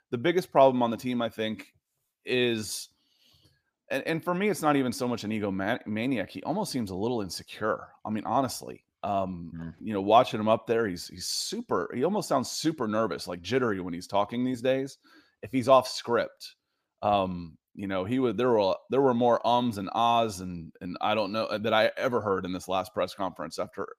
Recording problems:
none

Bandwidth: 15 kHz